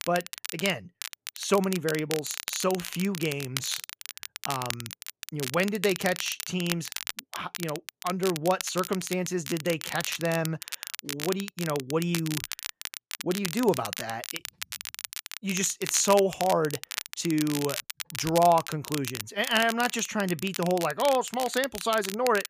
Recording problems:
crackle, like an old record; loud; 8 dB below the speech

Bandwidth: 15 kHz